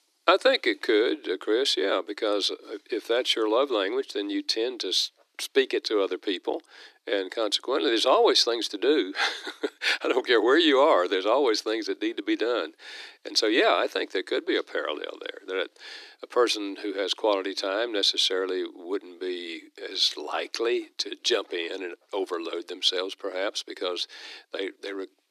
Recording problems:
thin; somewhat; fading below 300 Hz

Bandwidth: 14 kHz